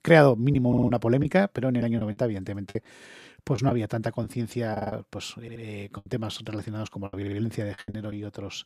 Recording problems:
choppy; very; 9% of the speech affected
audio stuttering; 4 times, first at 0.5 s

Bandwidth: 14.5 kHz